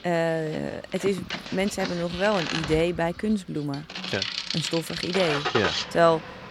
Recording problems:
traffic noise; loud; throughout; 4 dB below the speech

